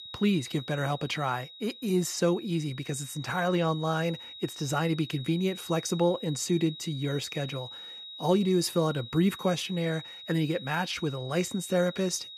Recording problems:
high-pitched whine; noticeable; throughout; 4 kHz, 15 dB below the speech

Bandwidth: 14.5 kHz